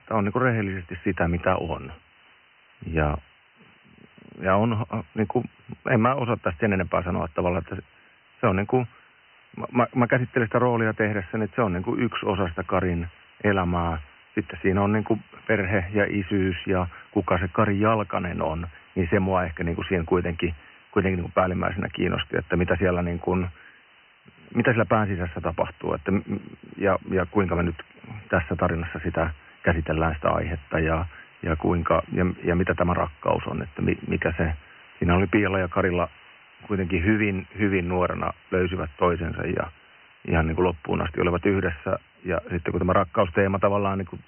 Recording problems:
high frequencies cut off; severe; nothing above 3 kHz
hiss; faint; throughout; 25 dB below the speech

